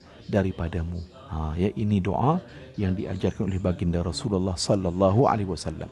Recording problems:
chatter from many people; faint; throughout; 20 dB below the speech

